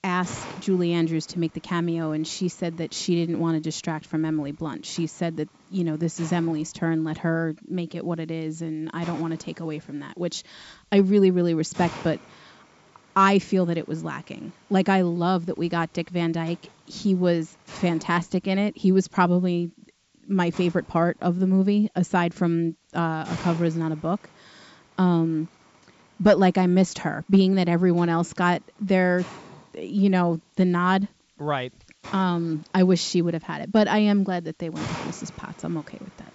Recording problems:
high frequencies cut off; noticeable; nothing above 8 kHz
hiss; noticeable; throughout; 20 dB below the speech

